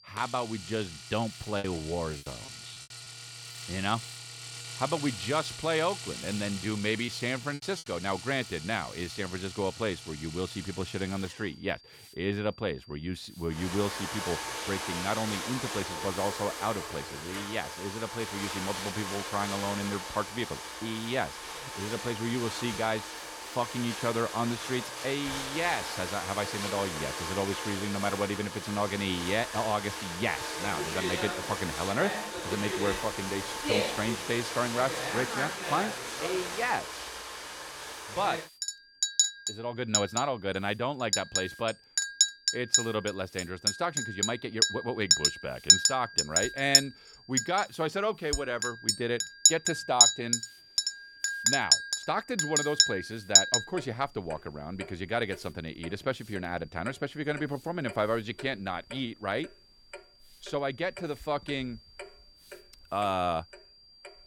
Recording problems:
household noises; very loud; throughout; 3 dB above the speech
high-pitched whine; faint; throughout; 4.5 kHz, 20 dB below the speech
hiss; faint; throughout; 25 dB below the speech
choppy; very; from 1.5 to 3 s and at 7 s; 10% of the speech affected

